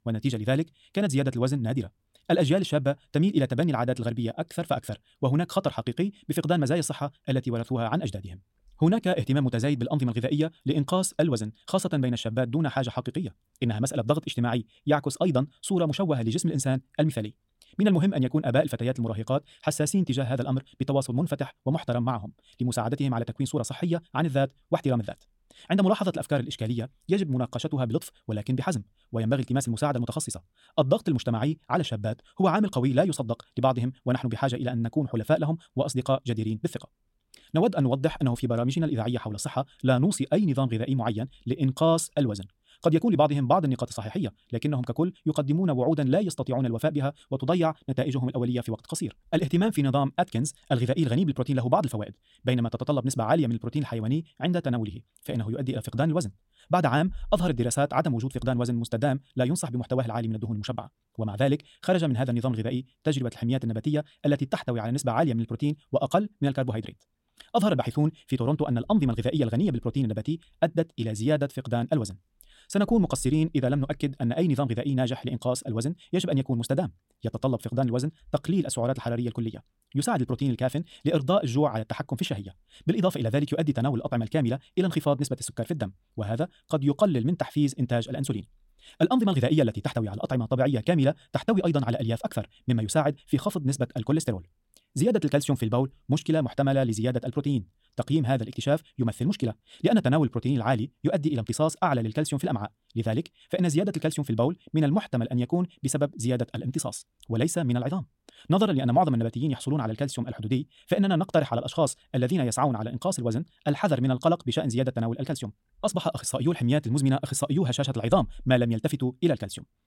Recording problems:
wrong speed, natural pitch; too fast; 1.7 times normal speed

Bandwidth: 16.5 kHz